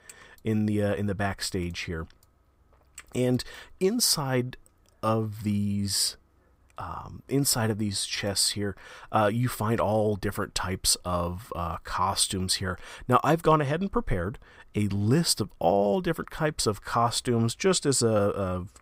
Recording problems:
none

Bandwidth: 15.5 kHz